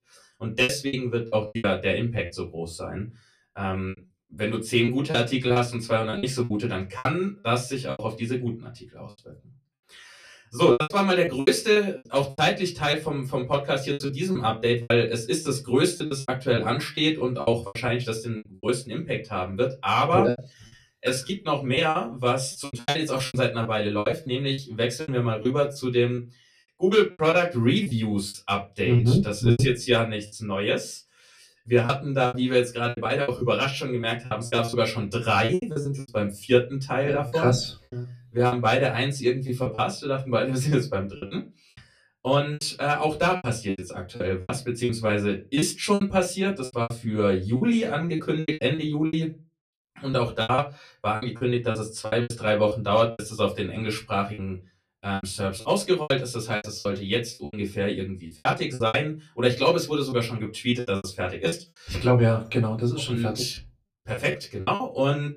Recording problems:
off-mic speech; far
room echo; very slight; dies away in 0.2 s
choppy; very; 13% of the speech affected

